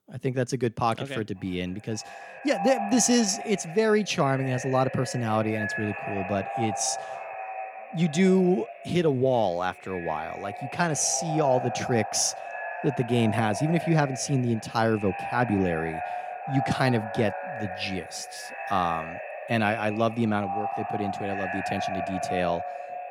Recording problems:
echo of what is said; strong; throughout; 540 ms later, 8 dB below the speech

